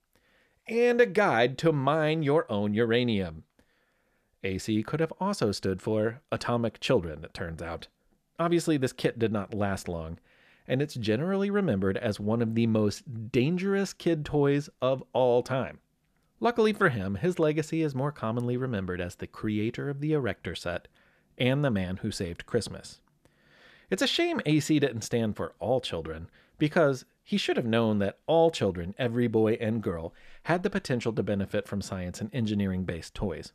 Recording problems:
none

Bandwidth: 14.5 kHz